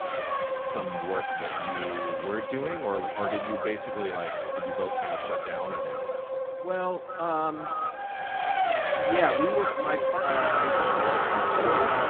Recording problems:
phone-call audio; poor line
echo of what is said; strong; throughout; 390 ms later, 7 dB below the speech
traffic noise; very loud; throughout; 4 dB above the speech
choppy; occasionally; under 1% of the speech affected

